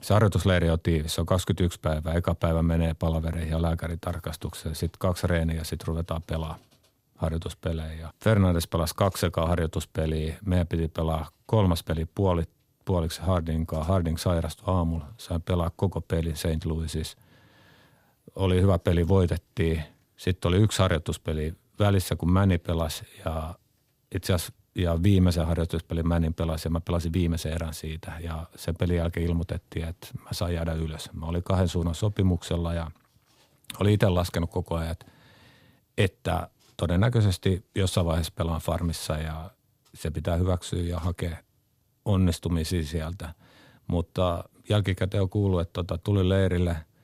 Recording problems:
none

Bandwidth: 15.5 kHz